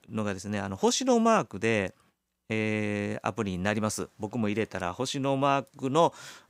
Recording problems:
none

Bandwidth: 15.5 kHz